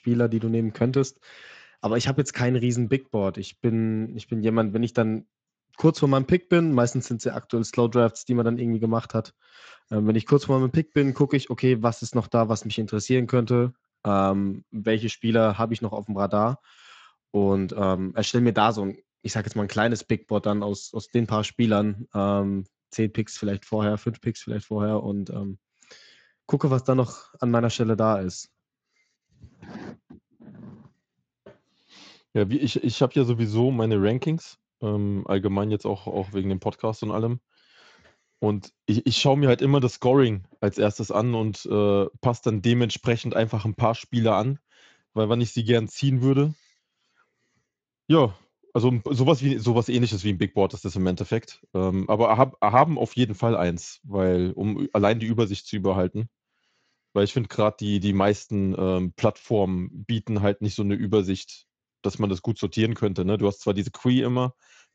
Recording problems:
garbled, watery; slightly; nothing above 7.5 kHz

